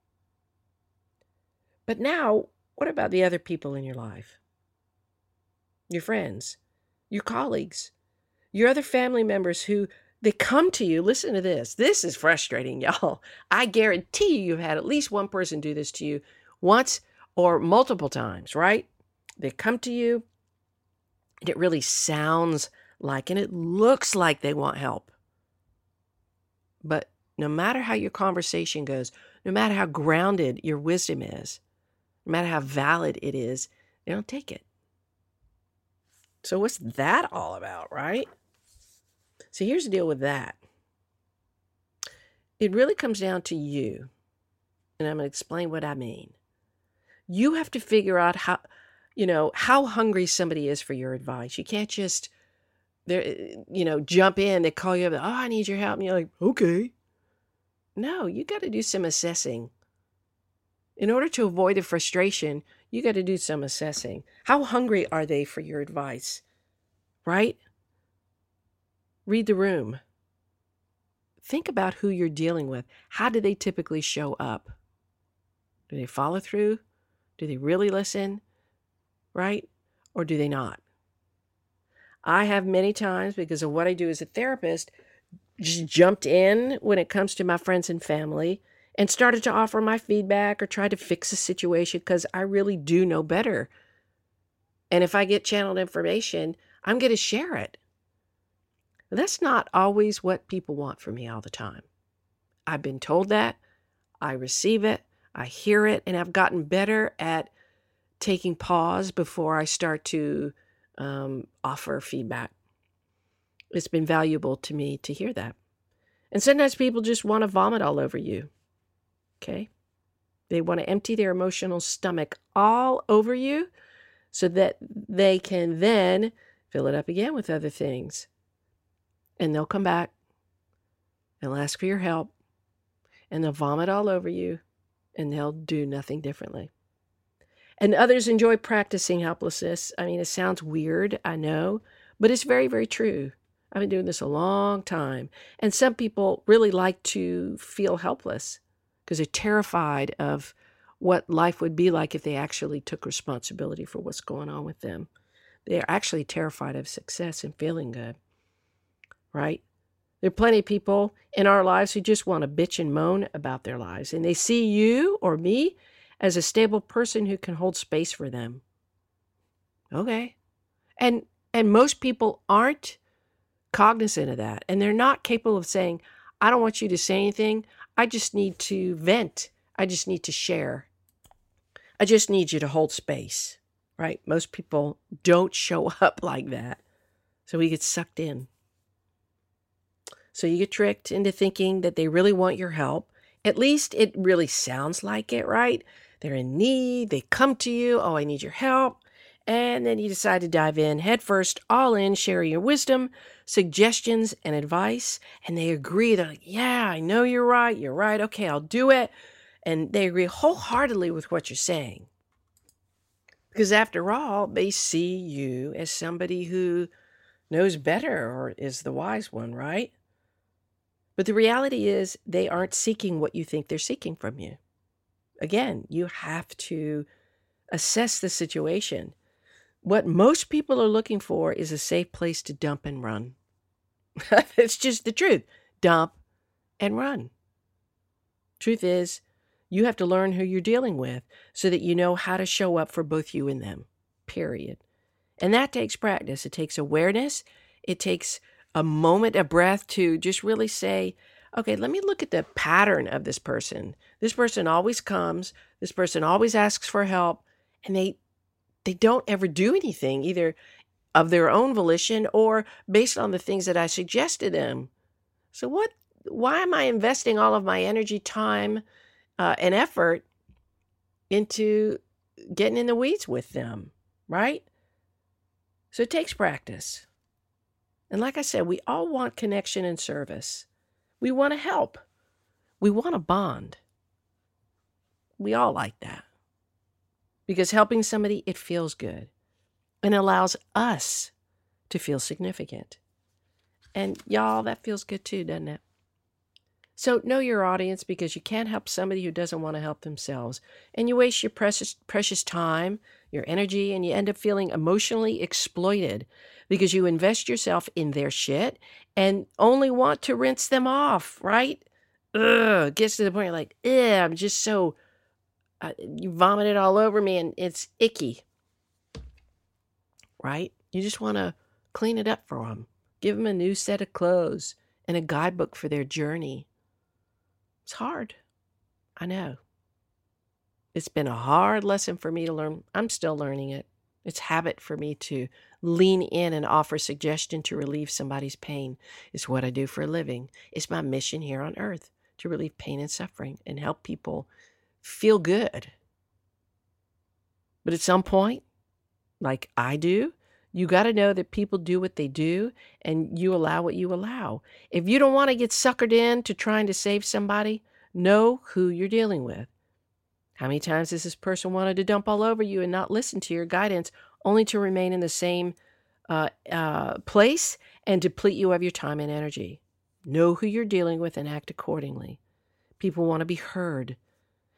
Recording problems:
none

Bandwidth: 16.5 kHz